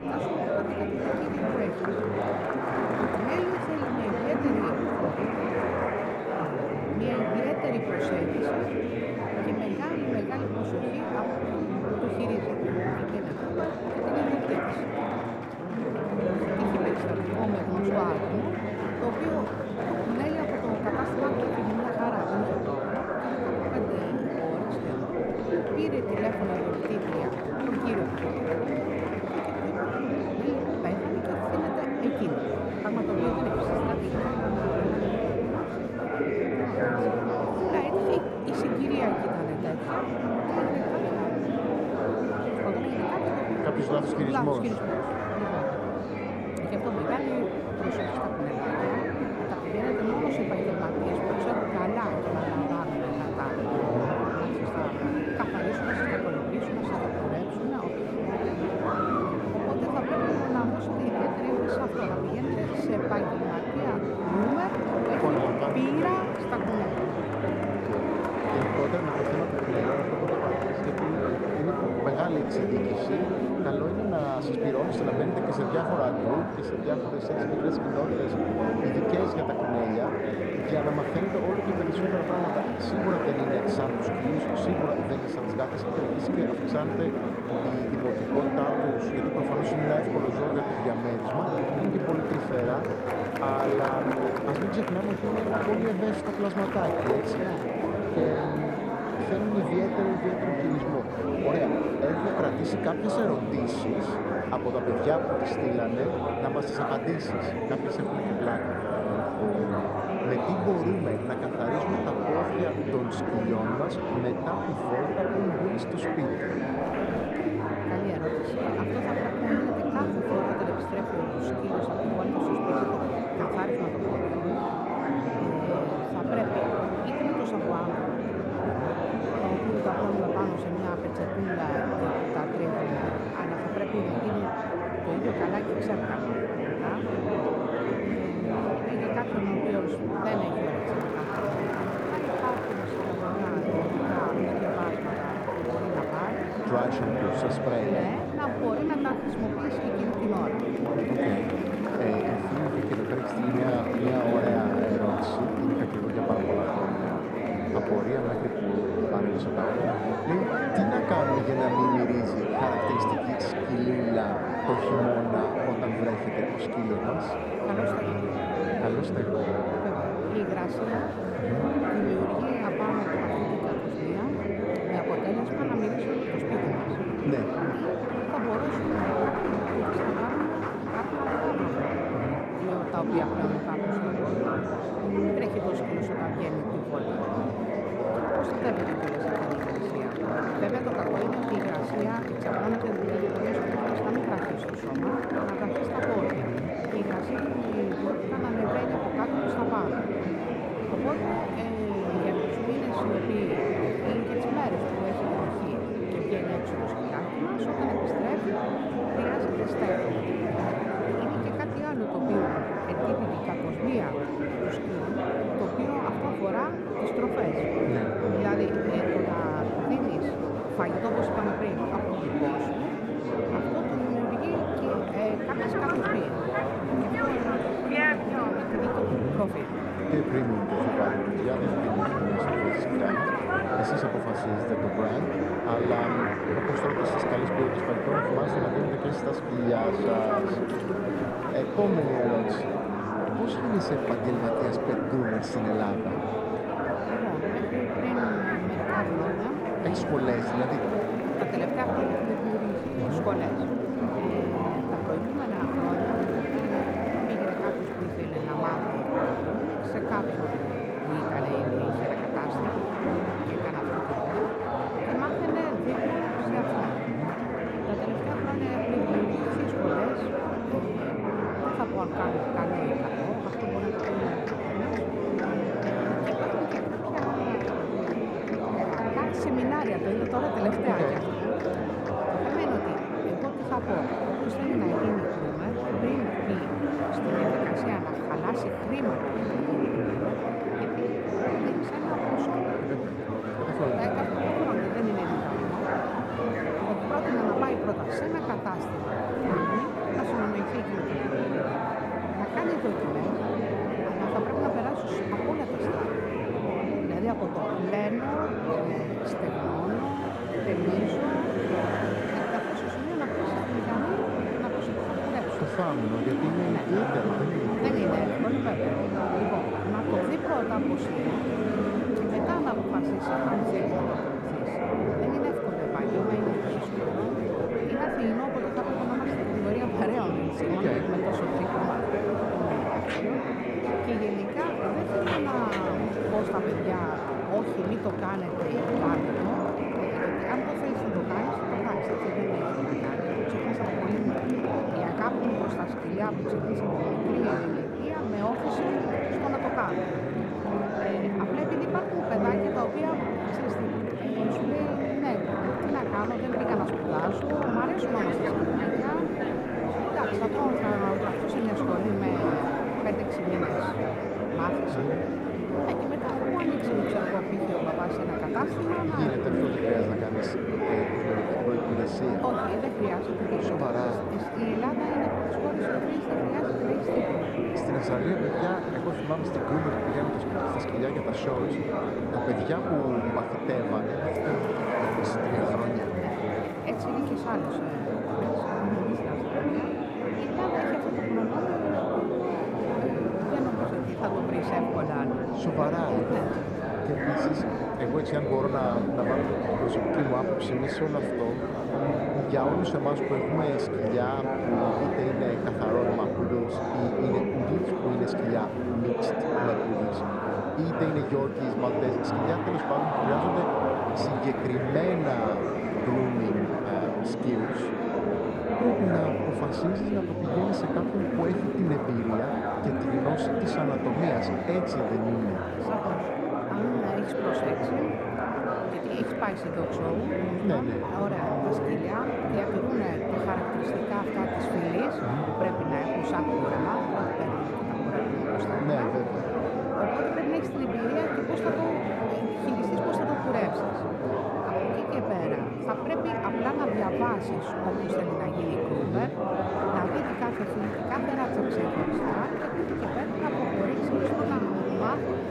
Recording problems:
muffled; slightly; fading above 2.5 kHz
murmuring crowd; very loud; throughout; 4 dB above the speech

